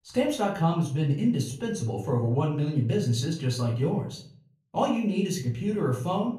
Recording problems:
off-mic speech; far
room echo; slight; dies away in 0.4 s

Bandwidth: 14.5 kHz